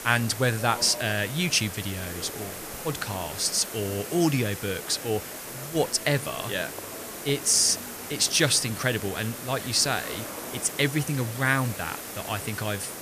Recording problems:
murmuring crowd; noticeable; throughout; 20 dB below the speech
hiss; noticeable; throughout; 10 dB below the speech

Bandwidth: 14.5 kHz